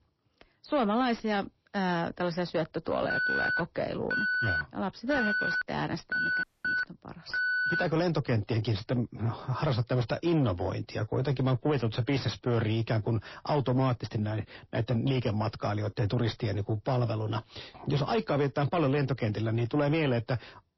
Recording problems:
distortion; slight; 10 dB below the speech
garbled, watery; slightly; nothing above 5.5 kHz
alarm; loud; from 3 to 8 s; peak 3 dB above the speech
audio cutting out; at 6.5 s

